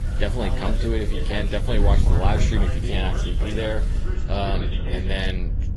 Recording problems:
garbled, watery; slightly; nothing above 11.5 kHz
background chatter; loud; throughout; 2 voices, 10 dB below the speech
rain or running water; noticeable; throughout; 15 dB below the speech
wind noise on the microphone; occasional gusts; 10 dB below the speech
electrical hum; faint; throughout; 50 Hz, 25 dB below the speech

